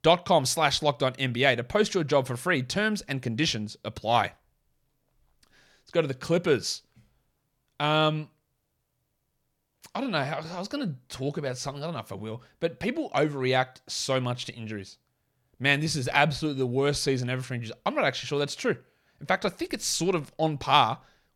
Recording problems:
none

